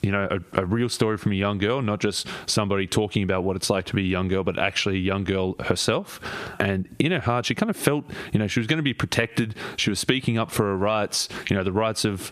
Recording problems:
squashed, flat; somewhat

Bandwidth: 14.5 kHz